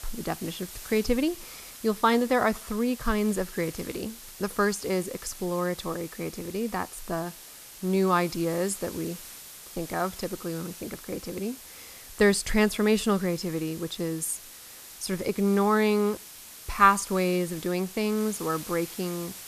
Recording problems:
hiss; noticeable; throughout; 15 dB below the speech

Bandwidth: 14.5 kHz